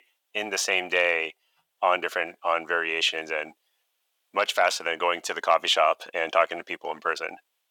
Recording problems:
thin; very; fading below 550 Hz

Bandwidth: 19 kHz